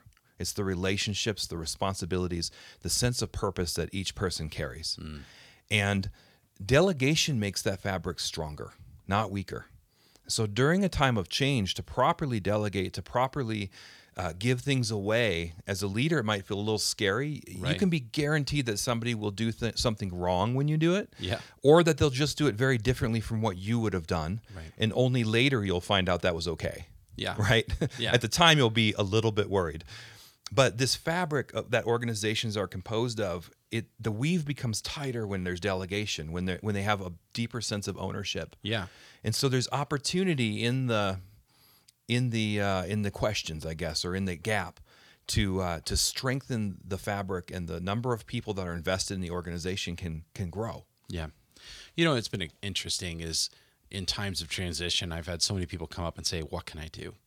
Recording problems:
none

